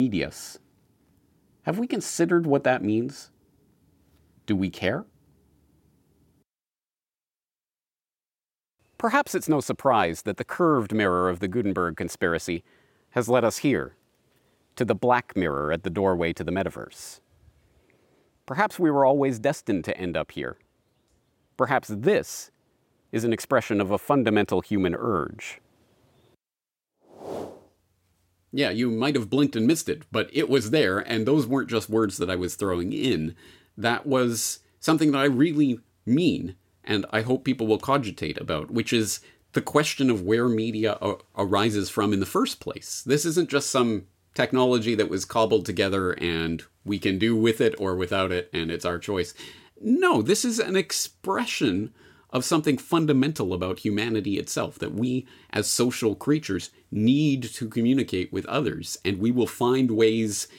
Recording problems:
abrupt cut into speech; at the start

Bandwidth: 16.5 kHz